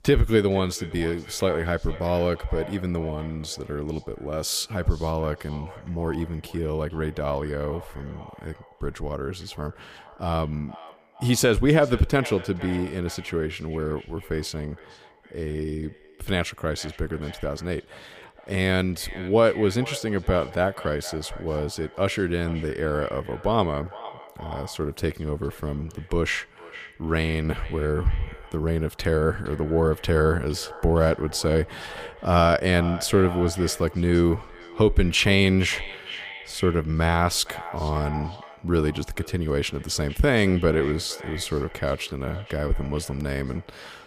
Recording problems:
echo of what is said; noticeable; throughout; 460 ms later, 15 dB below the speech

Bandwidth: 15 kHz